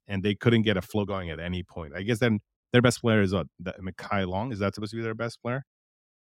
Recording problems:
uneven, jittery; strongly; from 1 to 5.5 s

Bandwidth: 16 kHz